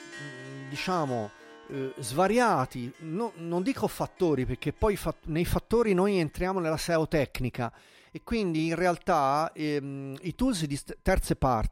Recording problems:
background music; faint; throughout; 20 dB below the speech

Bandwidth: 16 kHz